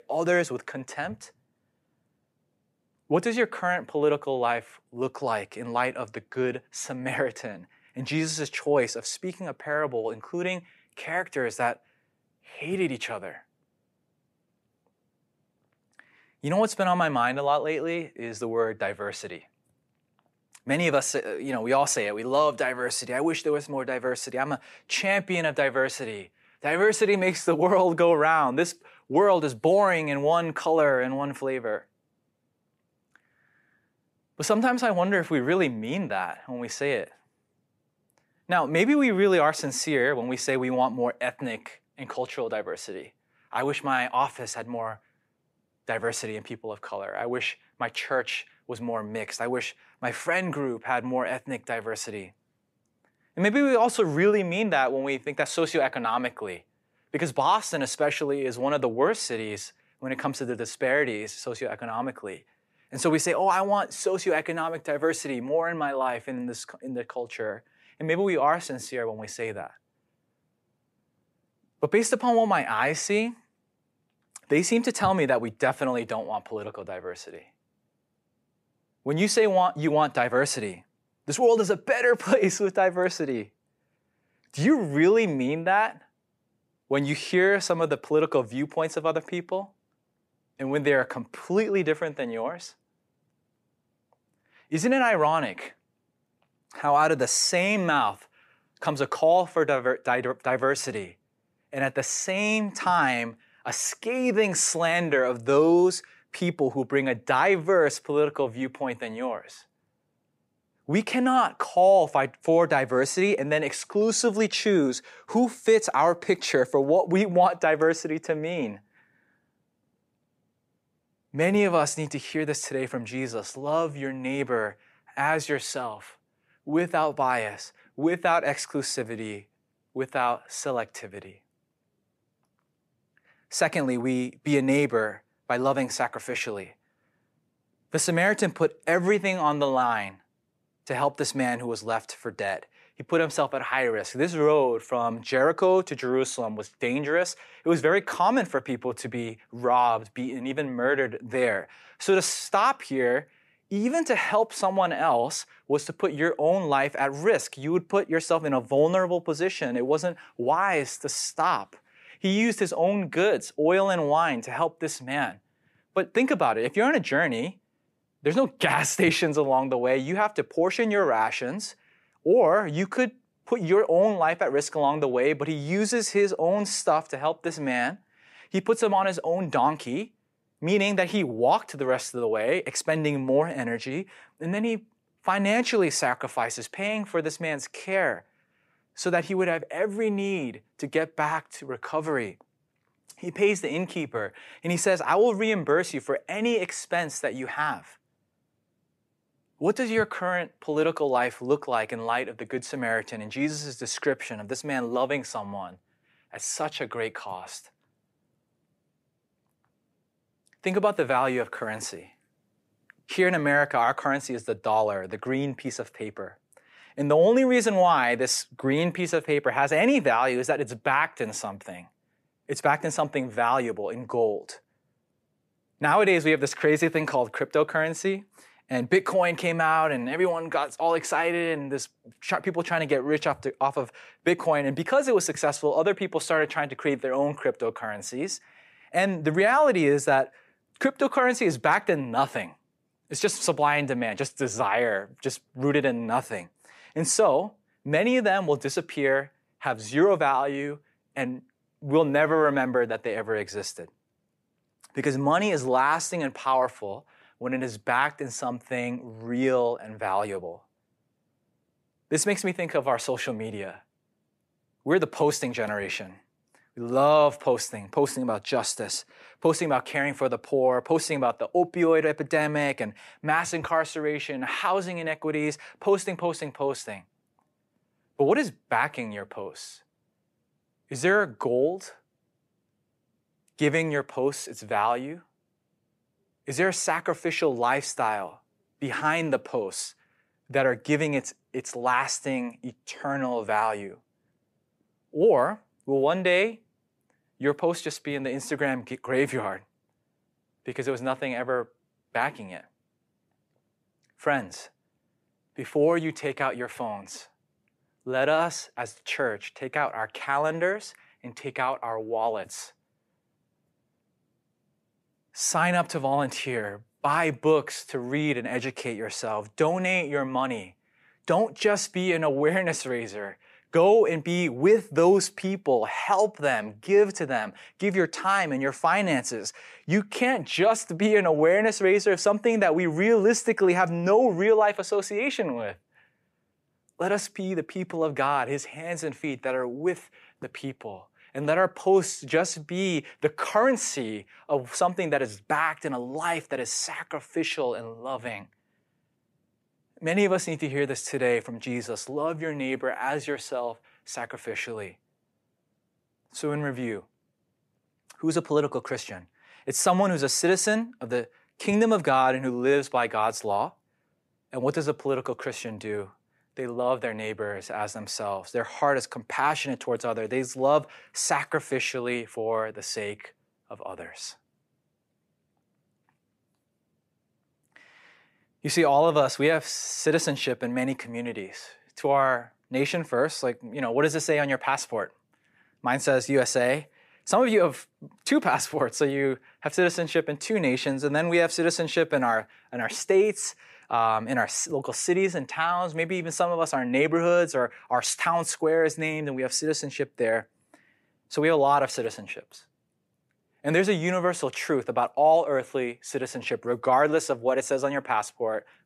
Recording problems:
none

